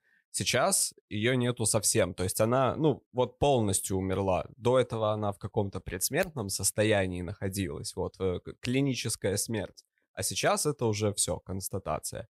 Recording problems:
none

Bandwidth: 15.5 kHz